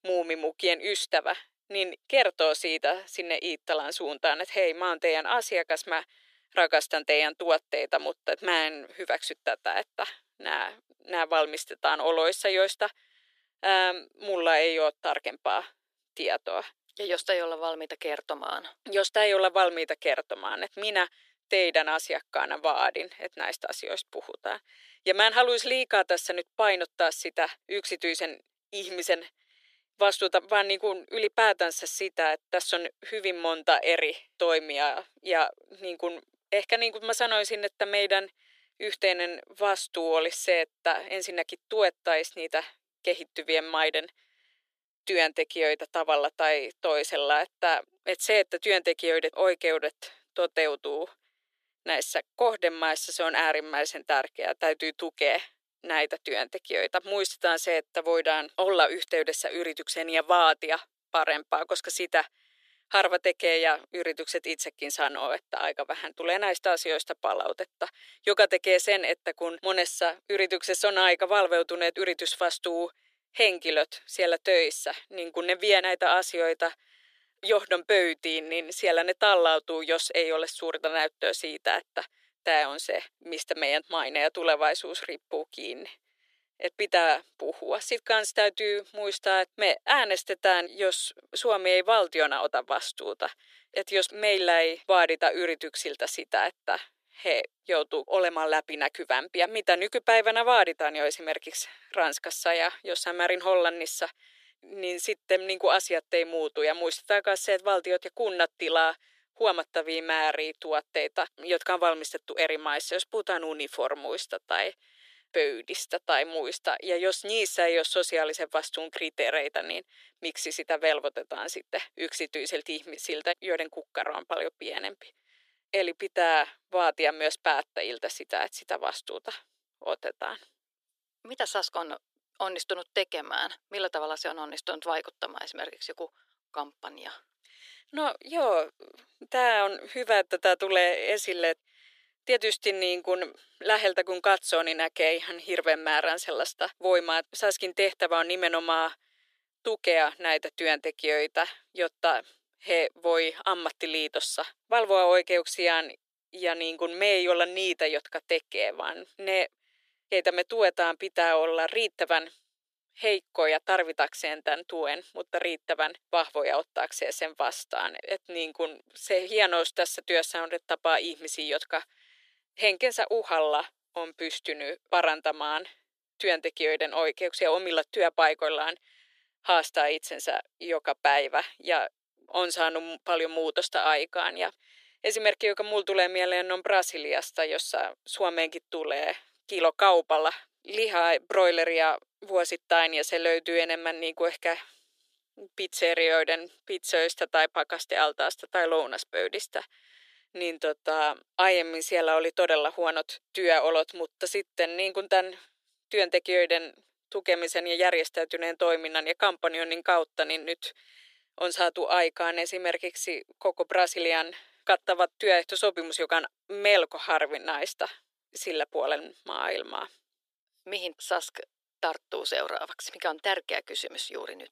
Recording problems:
thin; very; fading below 350 Hz

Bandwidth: 14.5 kHz